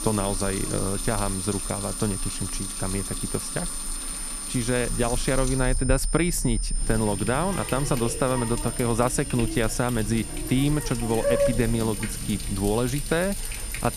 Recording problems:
high-pitched whine; loud; throughout; 9 kHz, 6 dB below the speech
household noises; loud; throughout; 7 dB below the speech
animal sounds; noticeable; throughout; 10 dB below the speech

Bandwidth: 14.5 kHz